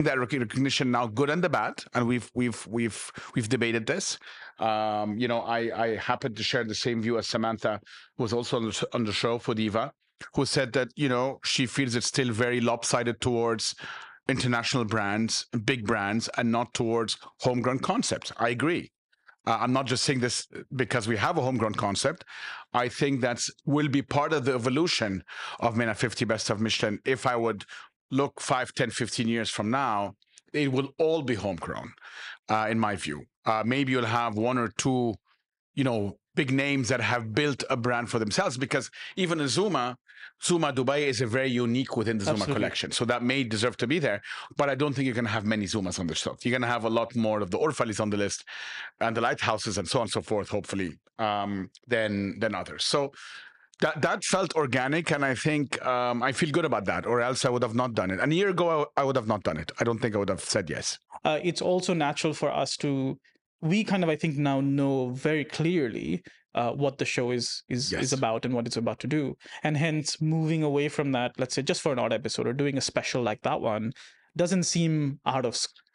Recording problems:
squashed, flat; somewhat
abrupt cut into speech; at the start

